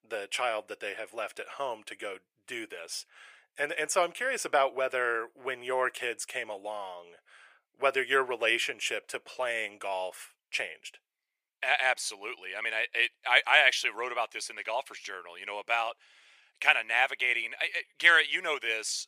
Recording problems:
thin; very; fading below 500 Hz

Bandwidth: 15 kHz